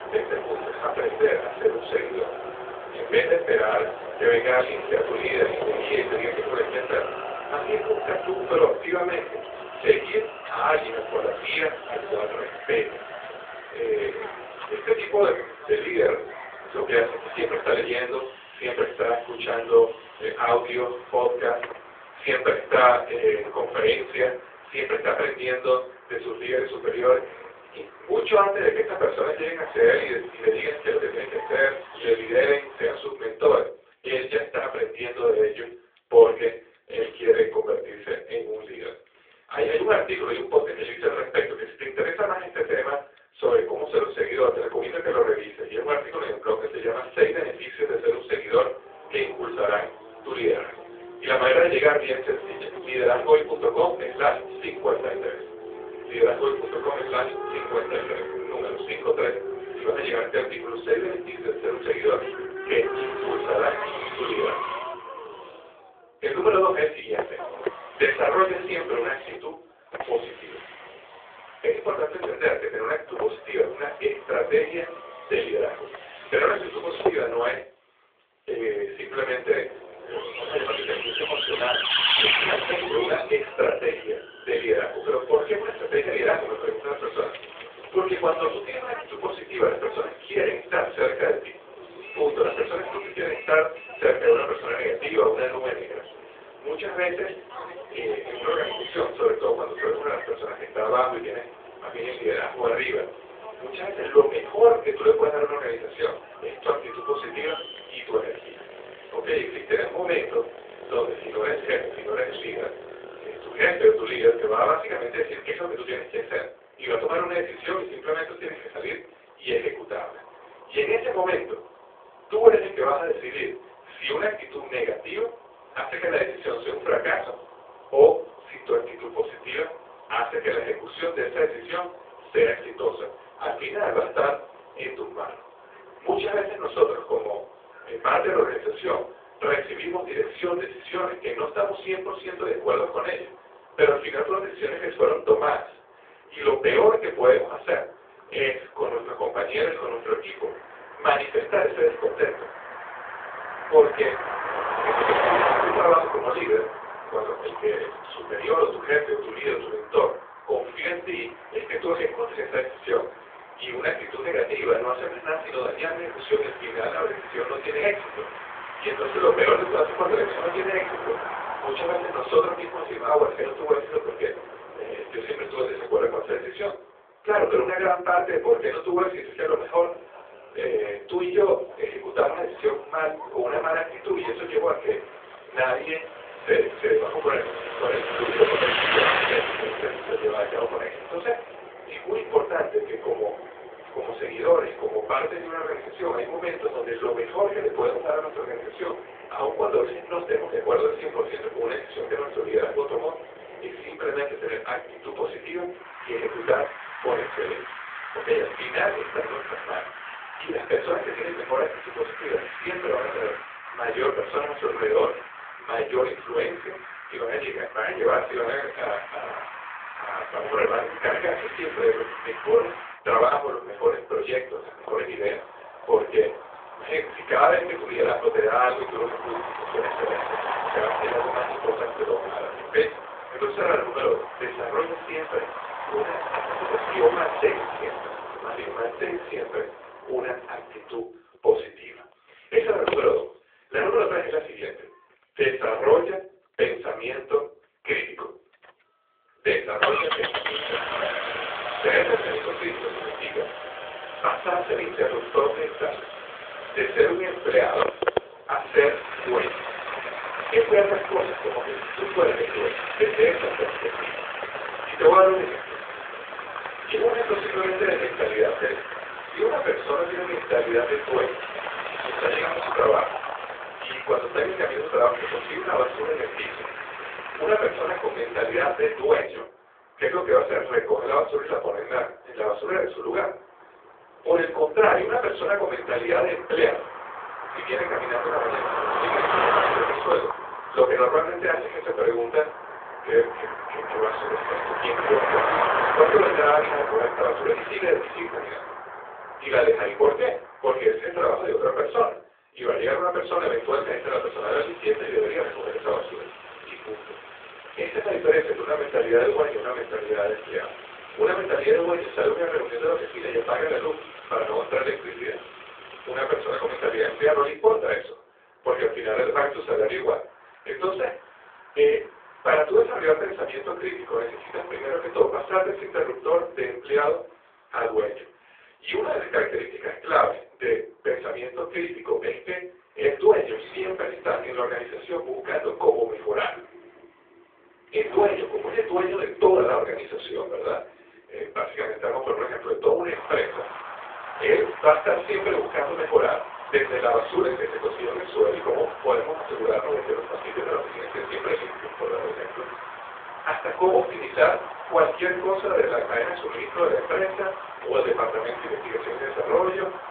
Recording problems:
off-mic speech; far
room echo; slight; dies away in 0.4 s
phone-call audio
traffic noise; loud; throughout; 8 dB below the speech

